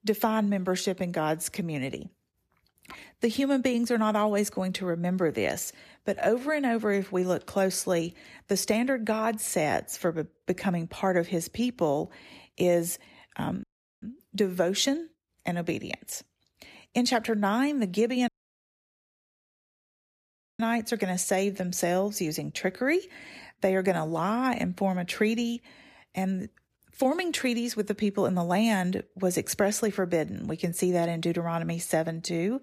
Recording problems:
audio cutting out; at 14 s and at 18 s for 2.5 s

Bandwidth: 14.5 kHz